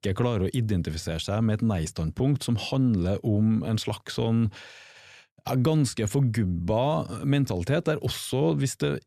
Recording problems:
none

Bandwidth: 14 kHz